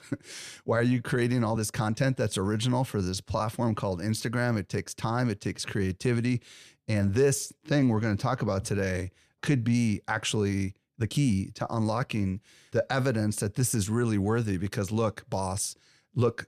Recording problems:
uneven, jittery; slightly; from 0.5 to 11 s

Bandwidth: 14 kHz